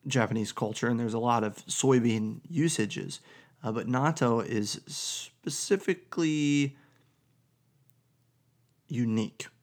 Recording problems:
none

